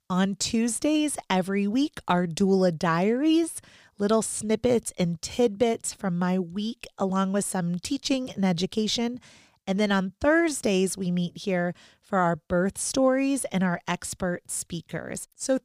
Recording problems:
none

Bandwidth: 15 kHz